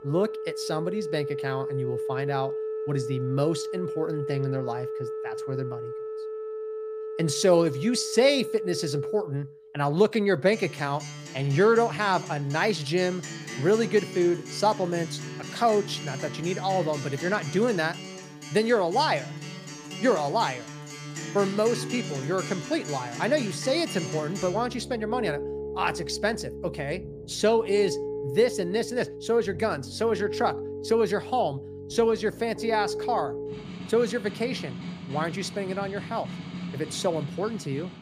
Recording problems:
background music; loud; throughout; 9 dB below the speech

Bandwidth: 15 kHz